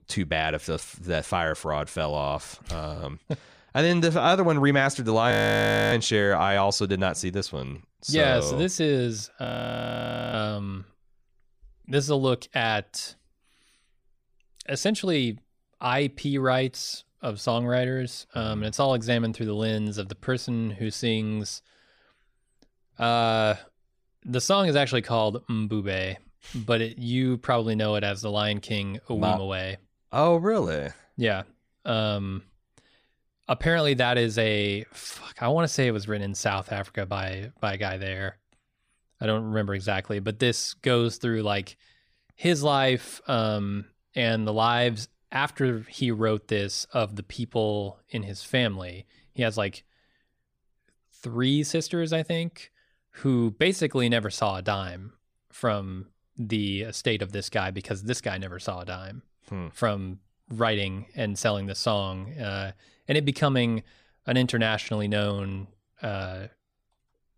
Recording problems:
audio freezing; at 5.5 s for 0.5 s and at 9.5 s for 1 s

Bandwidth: 15 kHz